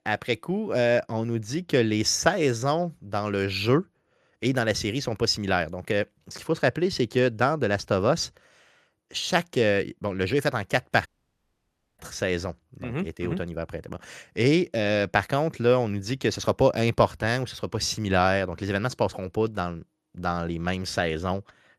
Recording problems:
audio cutting out; at 11 s for 1 s

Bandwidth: 13.5 kHz